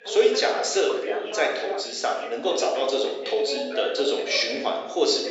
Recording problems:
room echo; noticeable; dies away in 0.9 s
thin; somewhat; fading below 350 Hz
high frequencies cut off; noticeable; nothing above 8 kHz
off-mic speech; somewhat distant
voice in the background; loud; throughout; 10 dB below the speech

